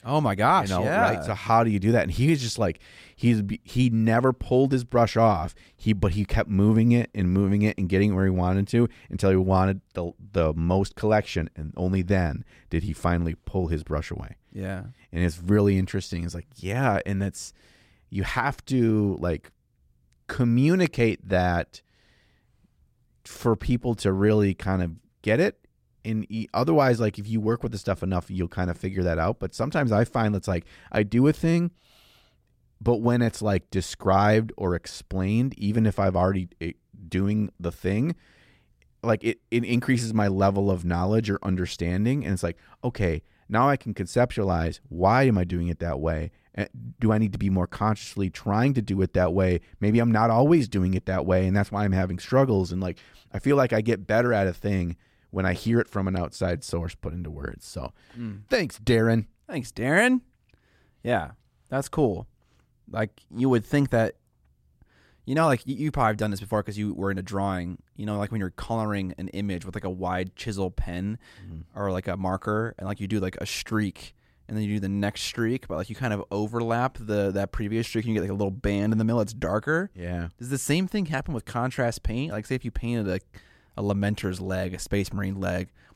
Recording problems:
none

